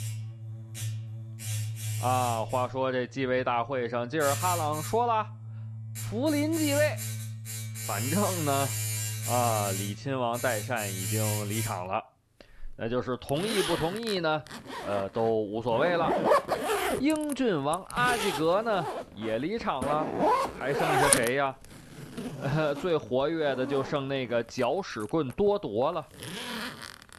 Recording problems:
household noises; loud; throughout; 3 dB below the speech

